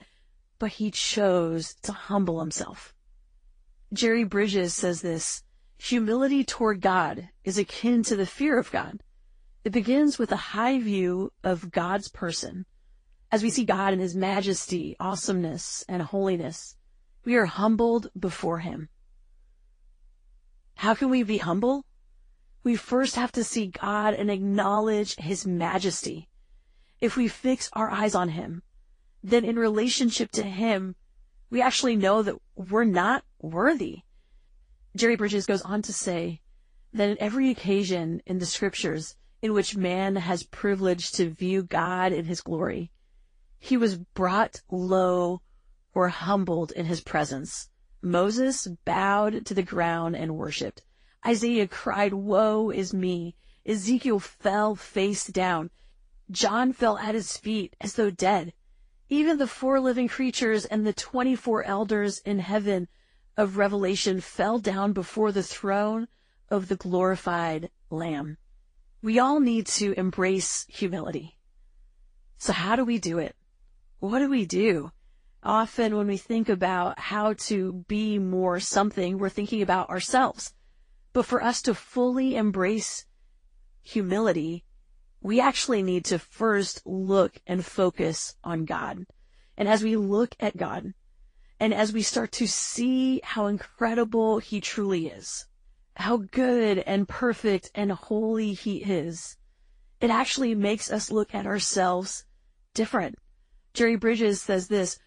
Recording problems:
garbled, watery; slightly; nothing above 9 kHz
uneven, jittery; strongly; from 13 s to 1:31

